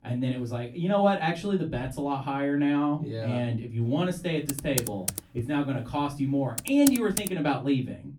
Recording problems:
off-mic speech; far
room echo; very slight; dies away in 0.3 s
keyboard typing; noticeable; from 4.5 to 7.5 s; peak 2 dB below the speech

